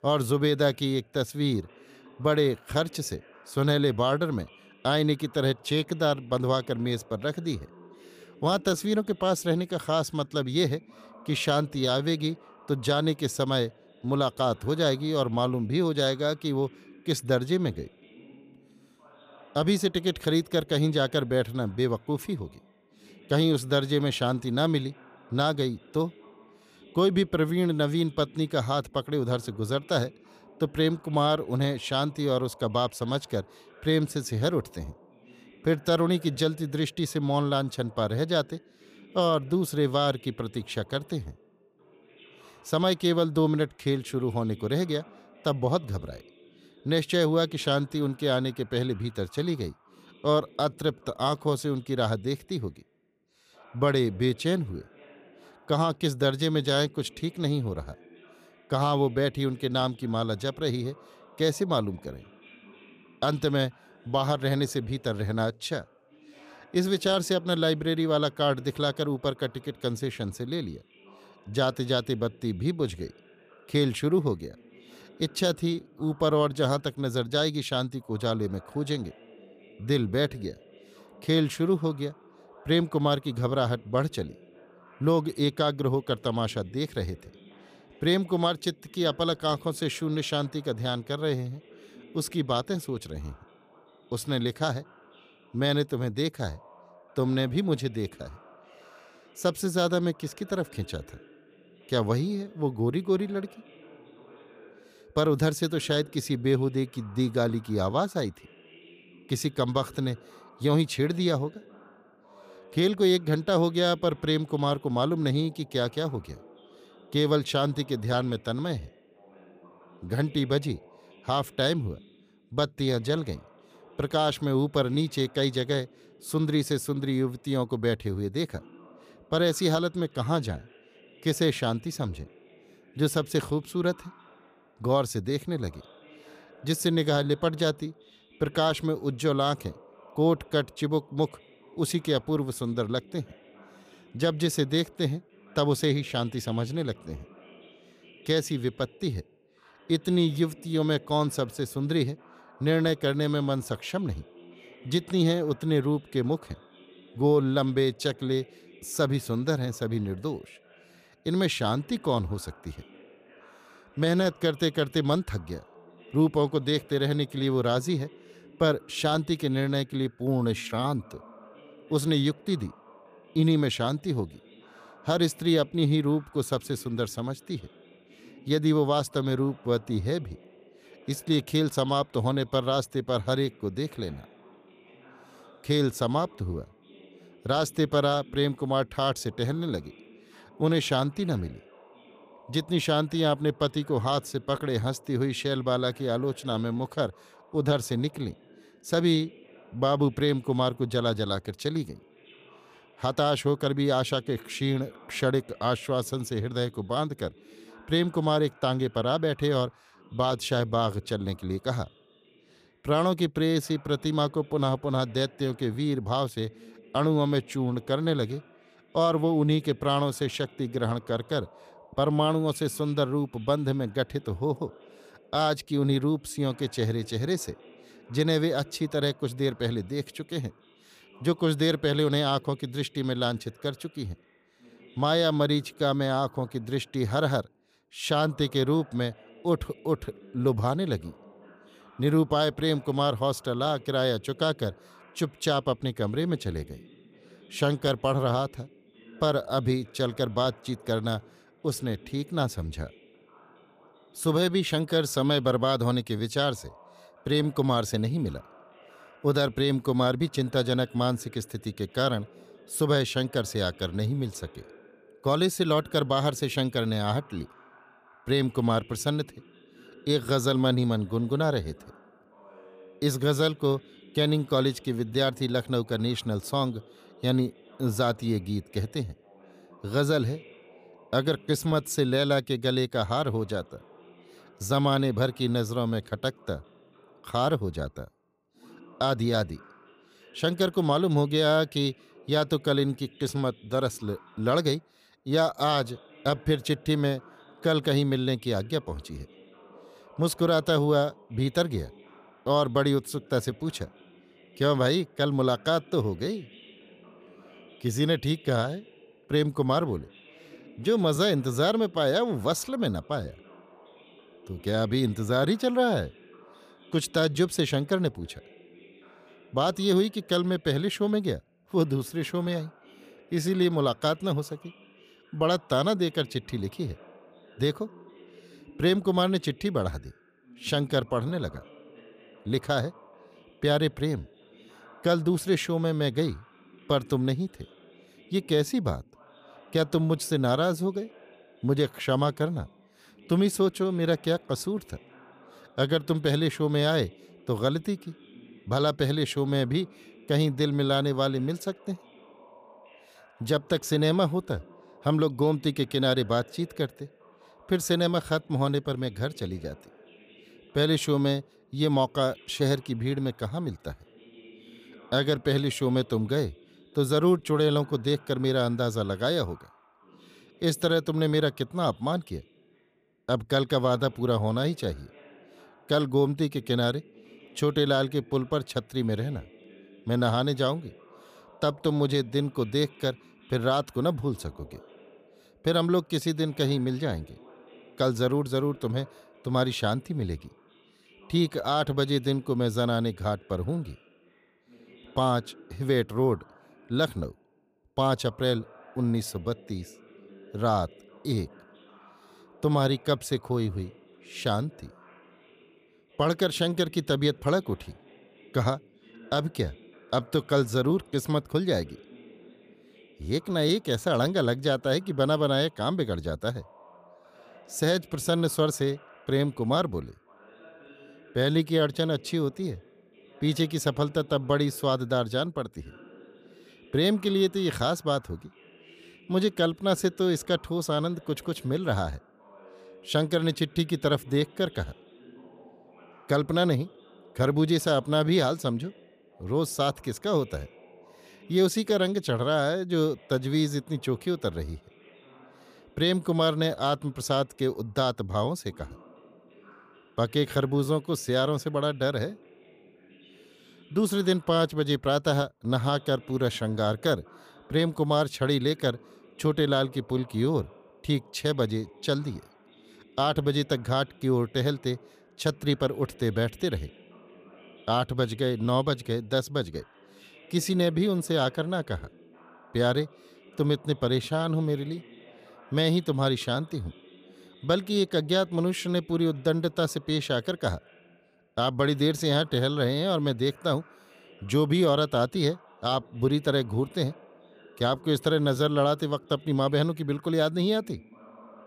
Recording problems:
voice in the background; faint; throughout; 25 dB below the speech

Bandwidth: 15 kHz